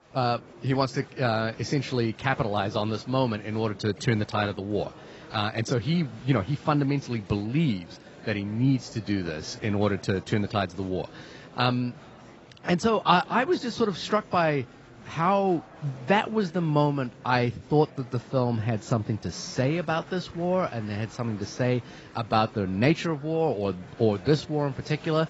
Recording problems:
garbled, watery; badly; nothing above 8 kHz
murmuring crowd; faint; throughout; 20 dB below the speech

